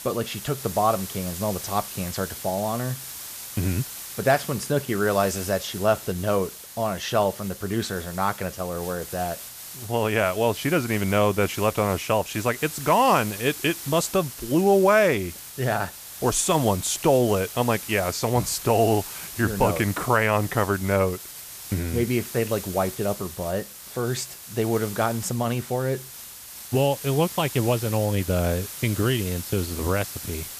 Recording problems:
hiss; noticeable; throughout; 10 dB below the speech

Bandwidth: 14.5 kHz